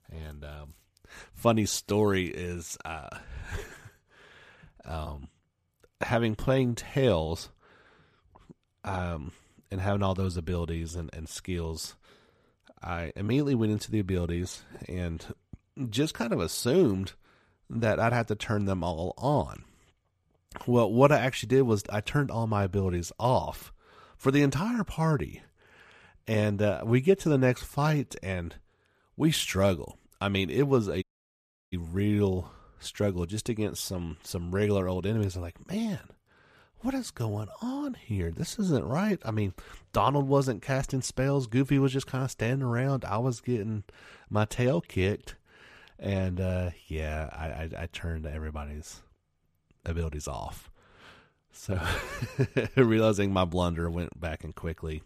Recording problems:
audio cutting out; at 31 s for 0.5 s

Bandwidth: 14.5 kHz